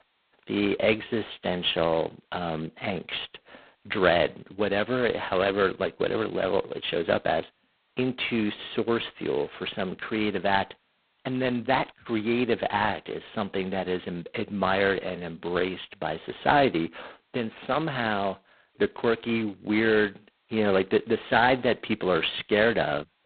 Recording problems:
phone-call audio; poor line; nothing above 4 kHz

